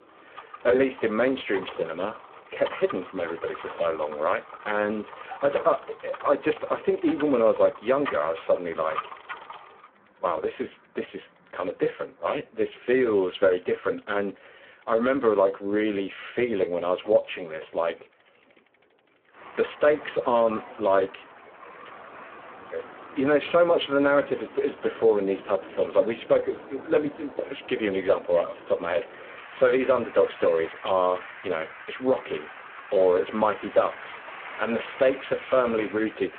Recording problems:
phone-call audio; poor line
traffic noise; noticeable; throughout; 15 dB below the speech

